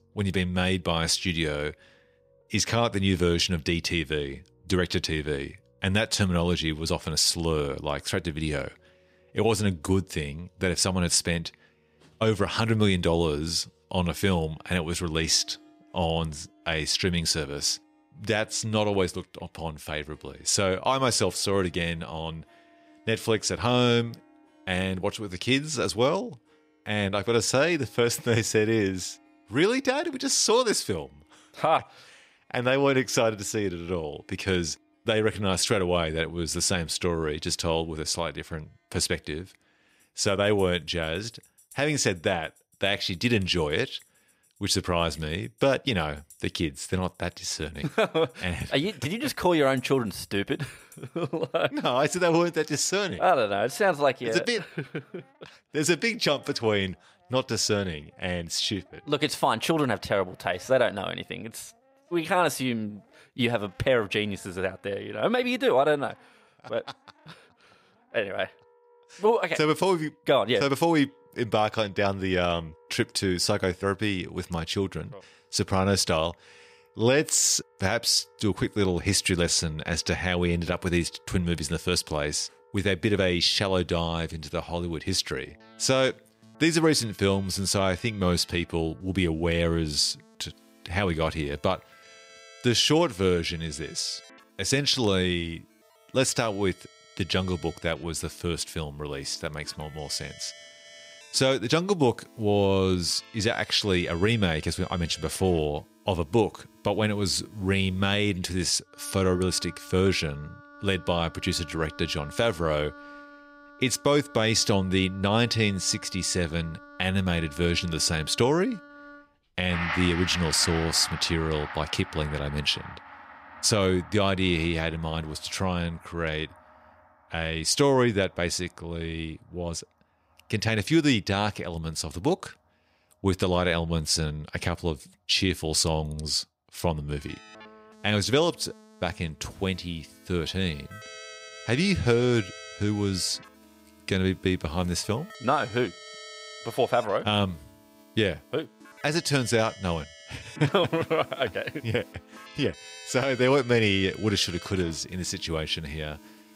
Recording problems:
background music; noticeable; throughout; 20 dB below the speech

